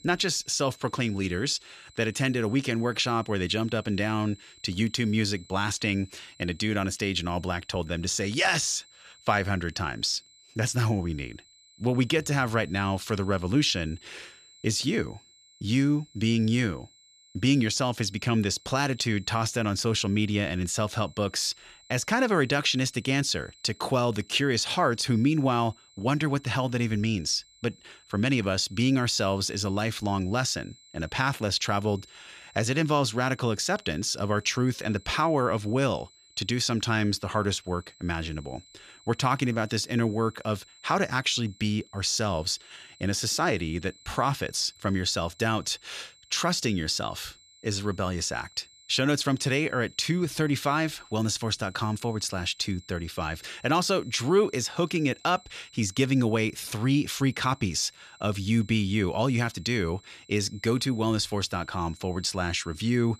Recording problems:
high-pitched whine; faint; throughout; 4 kHz, 25 dB below the speech

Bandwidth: 14.5 kHz